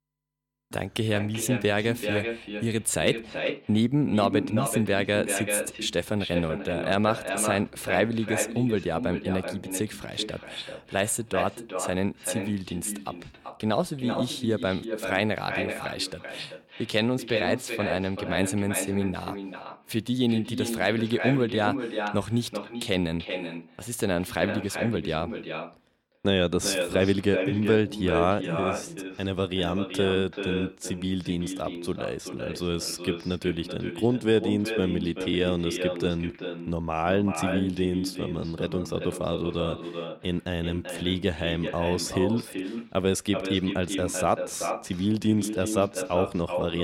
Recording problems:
echo of what is said; strong; throughout; 380 ms later, 6 dB below the speech
abrupt cut into speech; at the end

